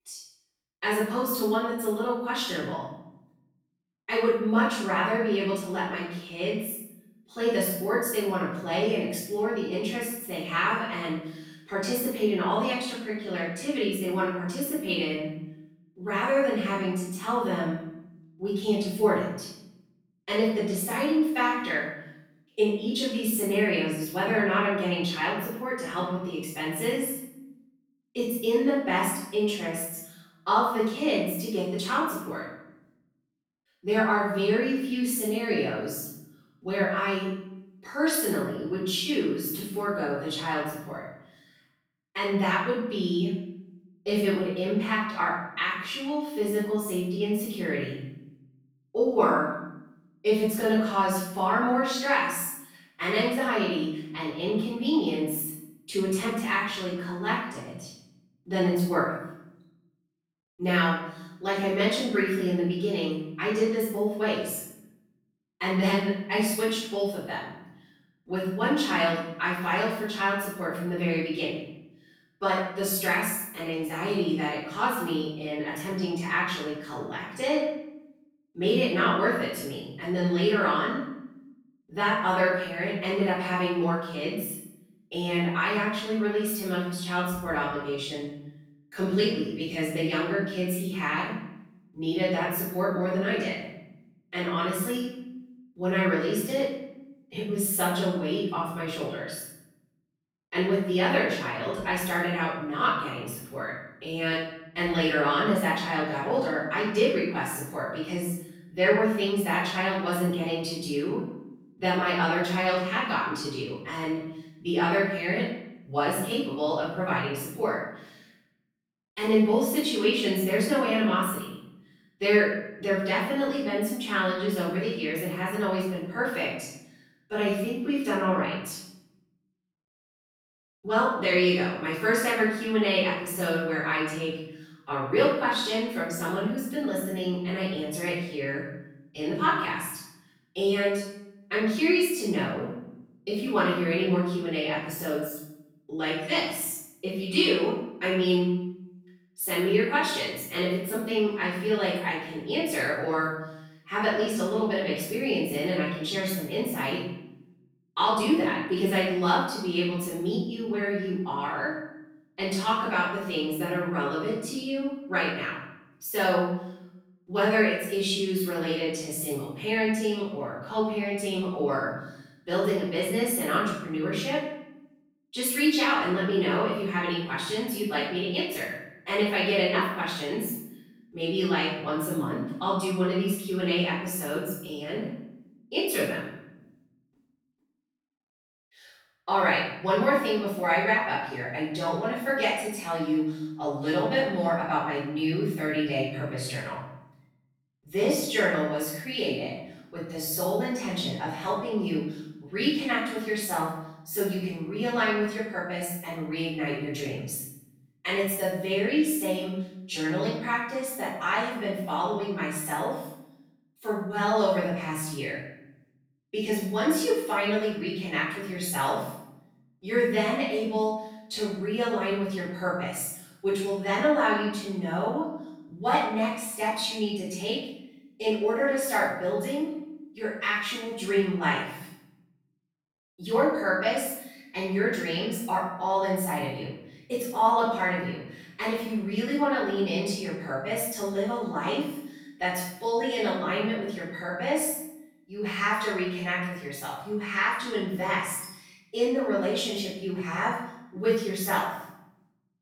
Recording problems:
room echo; strong; dies away in 0.7 s
off-mic speech; far

